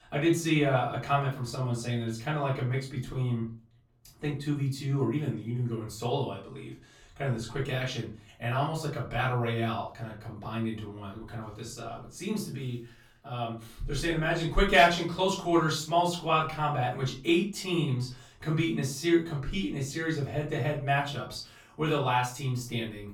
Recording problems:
off-mic speech; far
room echo; slight; dies away in 0.3 s

